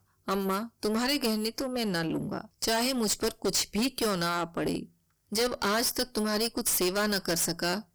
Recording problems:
distortion; heavy; 18% of the sound clipped

